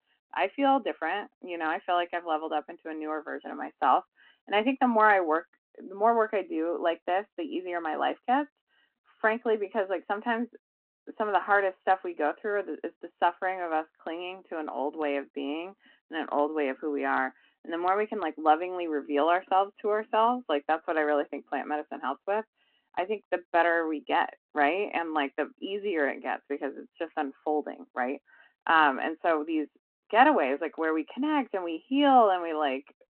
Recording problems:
phone-call audio

